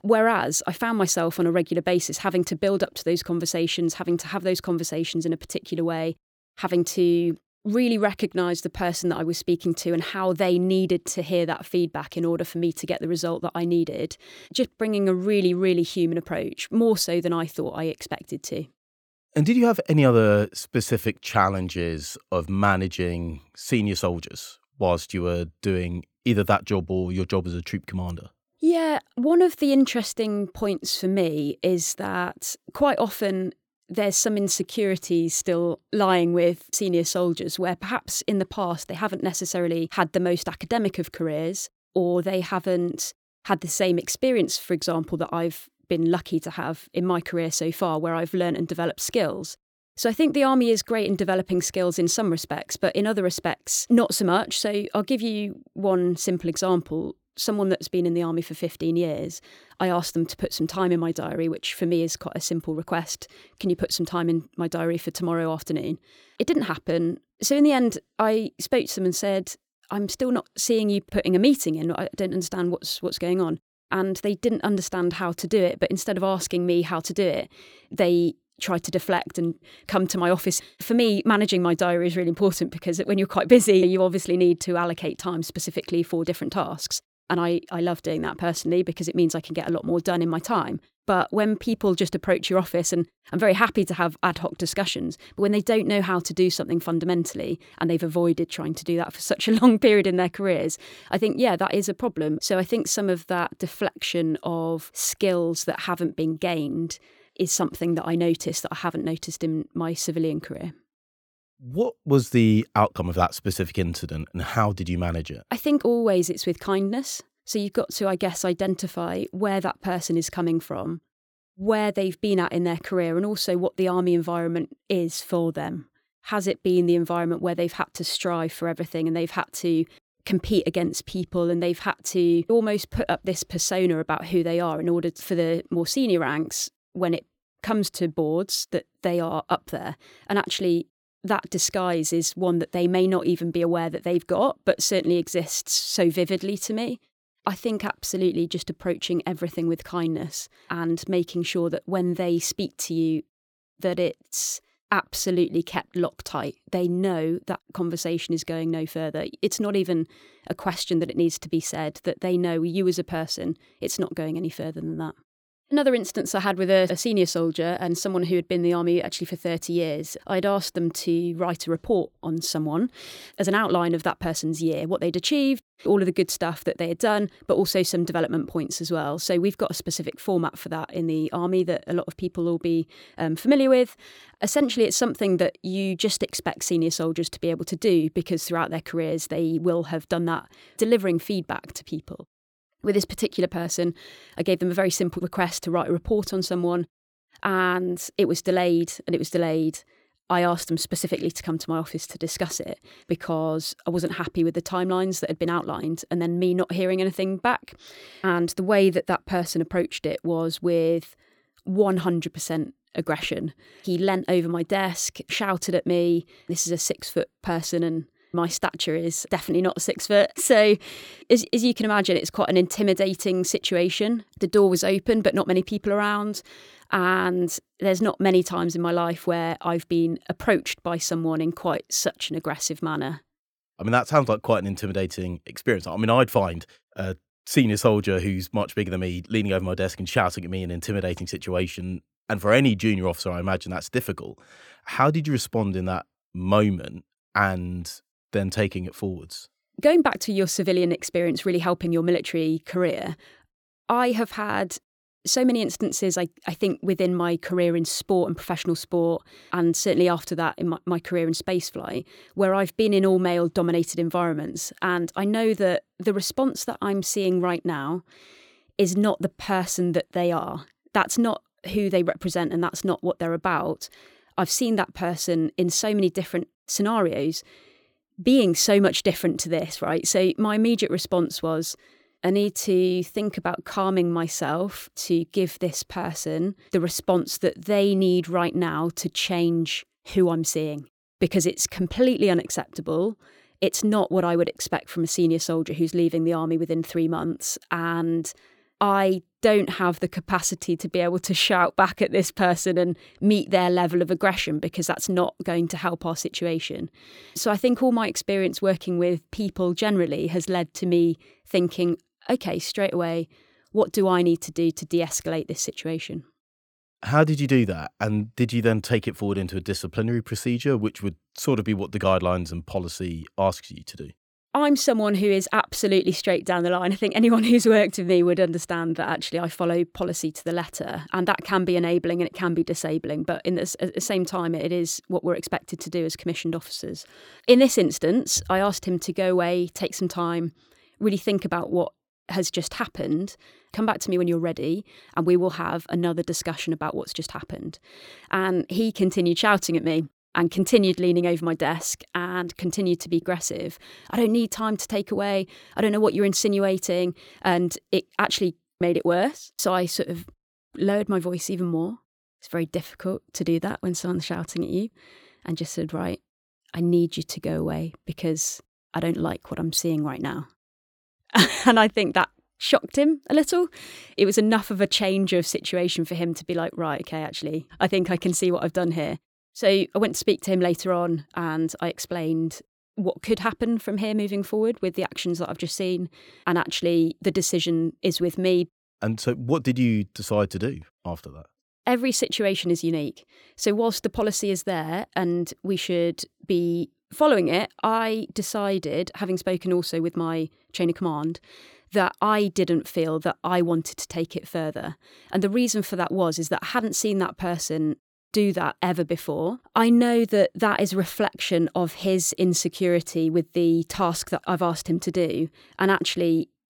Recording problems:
none

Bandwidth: 19 kHz